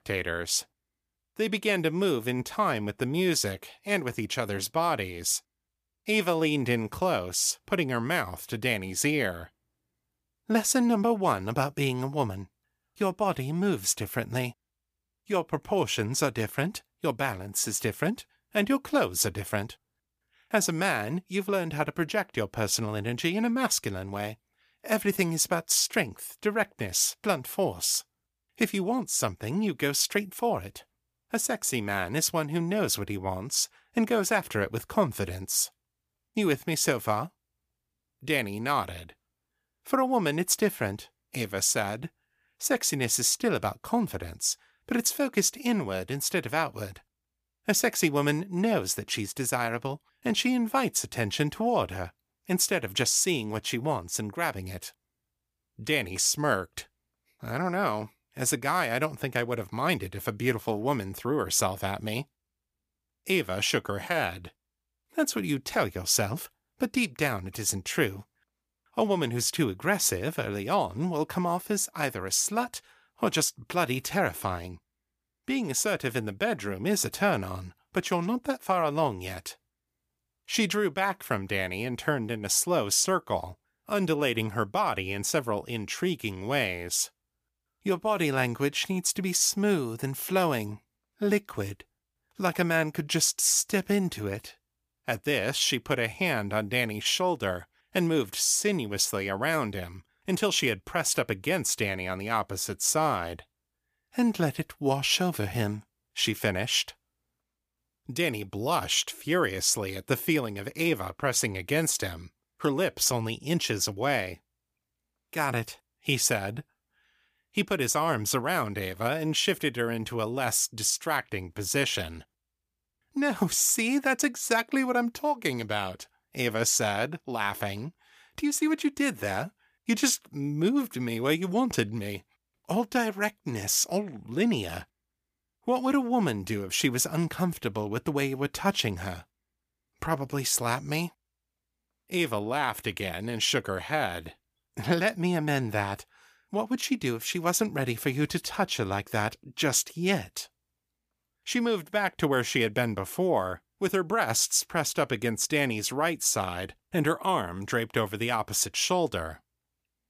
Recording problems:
none

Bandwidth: 15 kHz